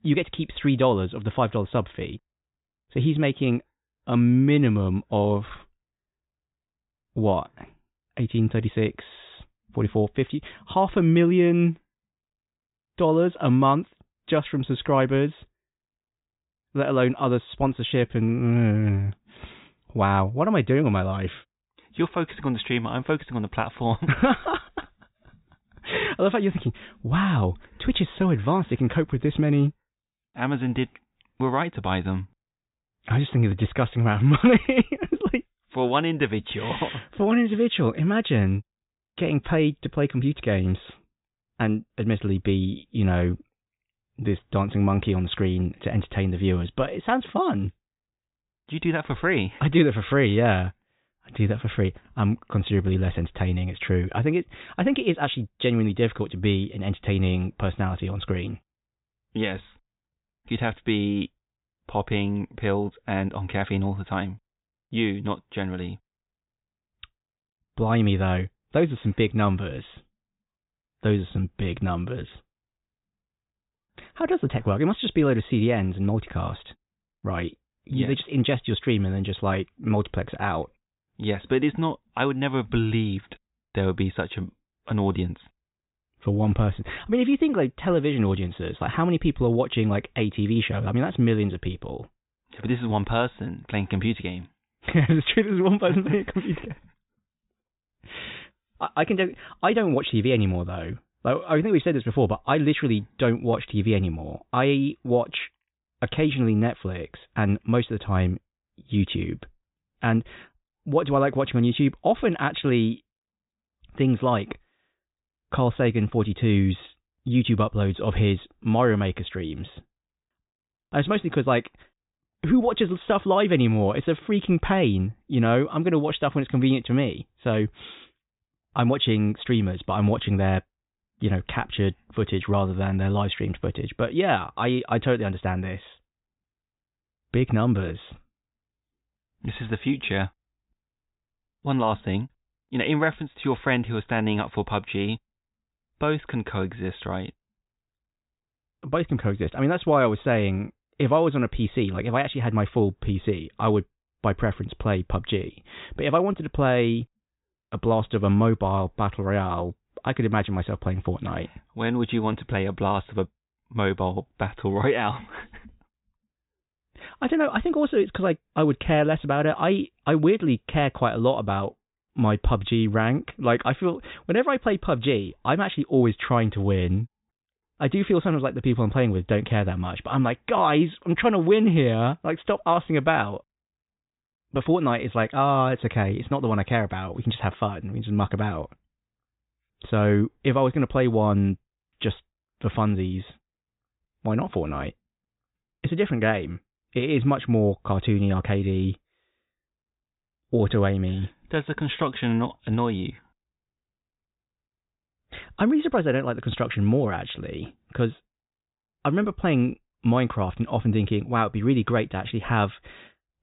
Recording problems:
high frequencies cut off; severe; nothing above 4 kHz

